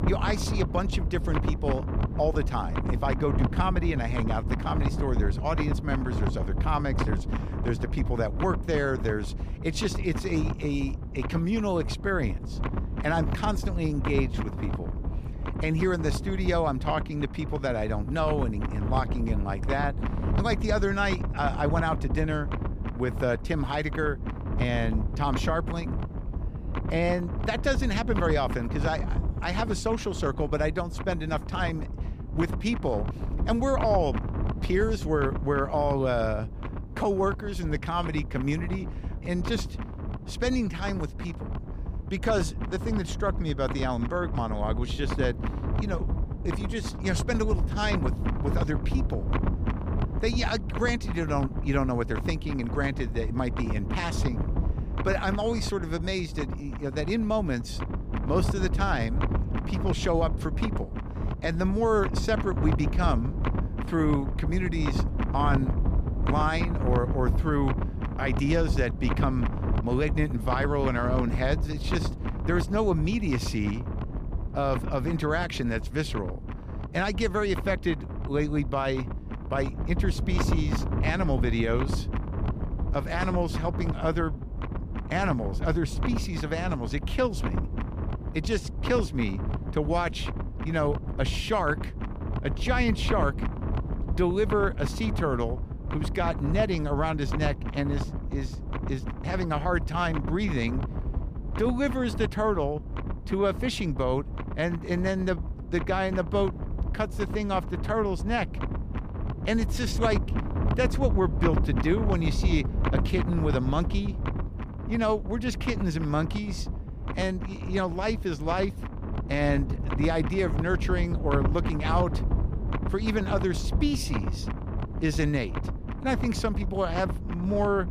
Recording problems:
wind noise on the microphone; heavy; 9 dB below the speech

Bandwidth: 15 kHz